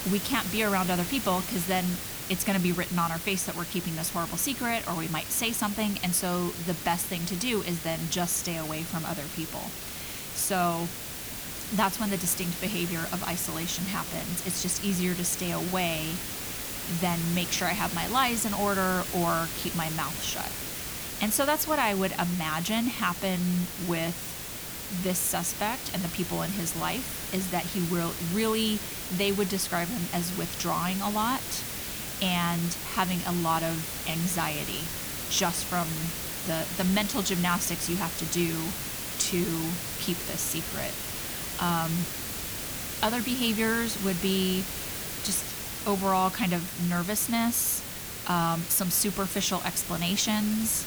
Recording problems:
hiss; loud; throughout; 4 dB below the speech

